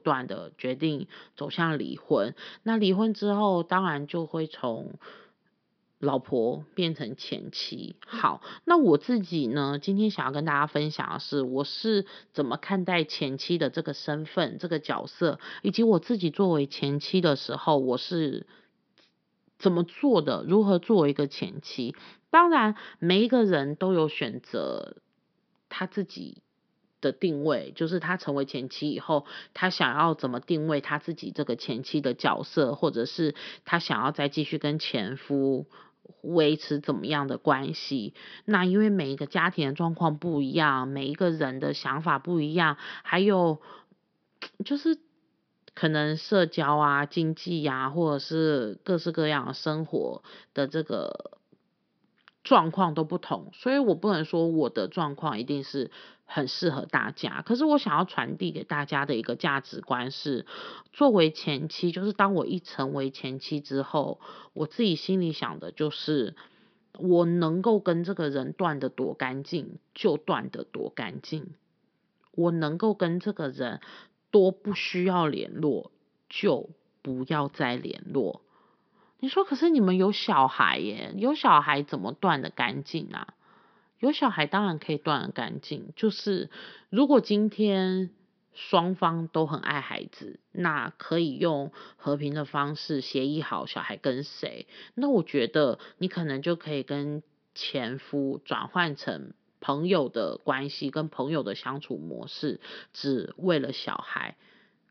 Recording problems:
high frequencies cut off; noticeable; nothing above 5.5 kHz

